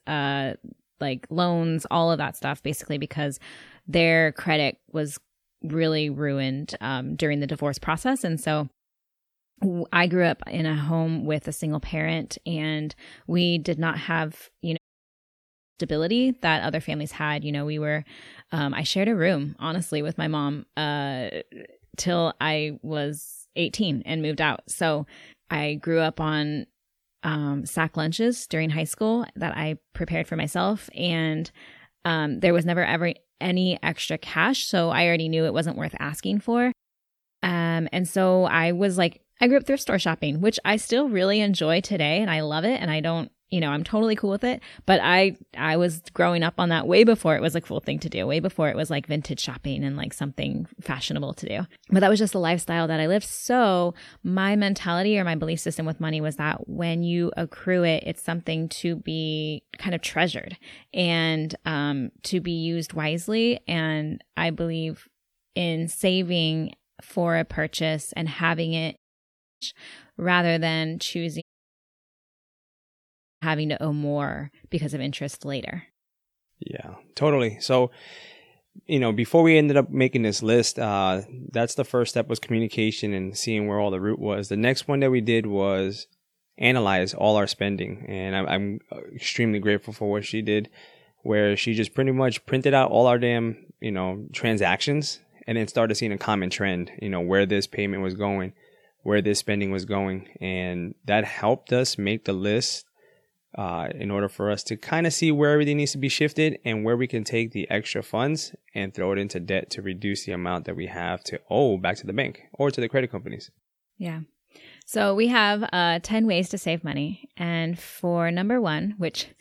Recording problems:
audio cutting out; at 15 s for 1 s, at 1:09 for 0.5 s and at 1:11 for 2 s

